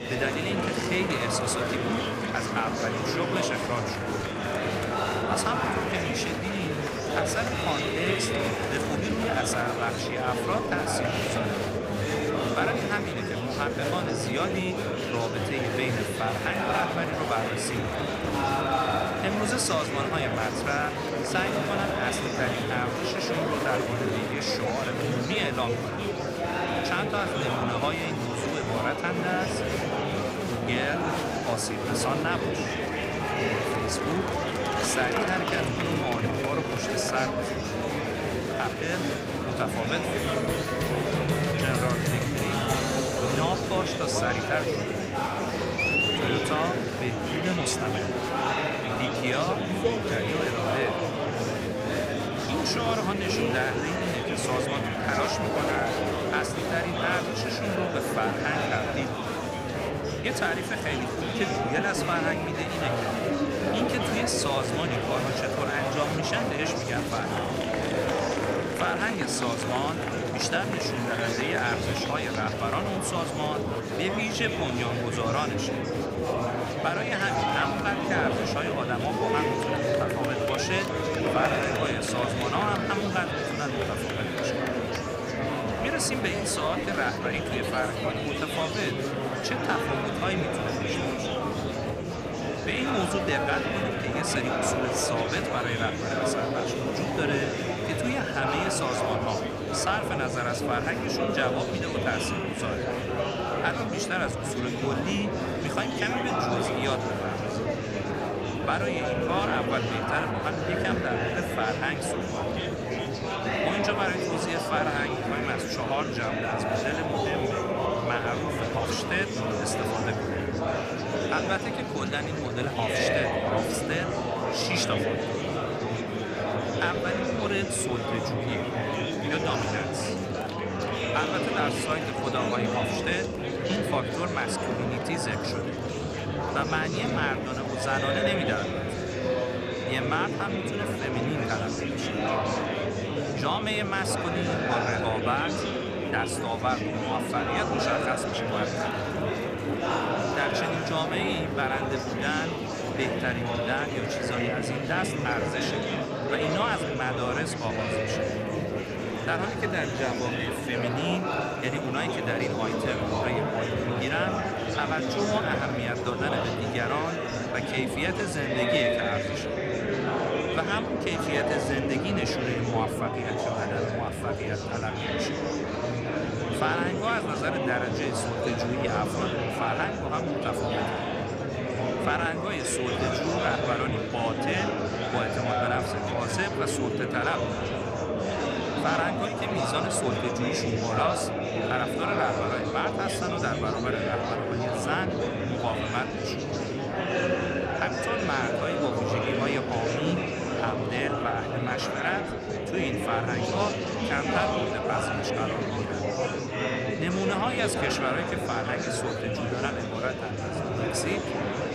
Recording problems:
murmuring crowd; very loud; throughout; 2 dB above the speech

